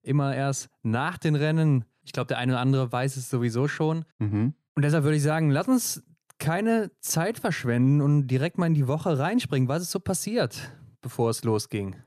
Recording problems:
none

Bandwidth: 14.5 kHz